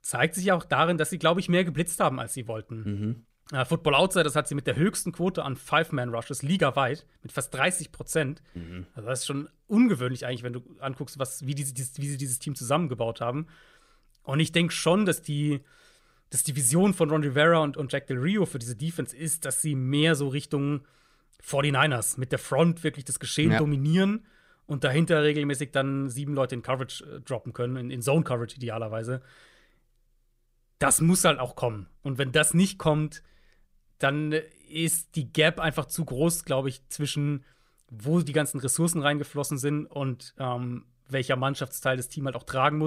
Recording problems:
abrupt cut into speech; at the end

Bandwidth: 15.5 kHz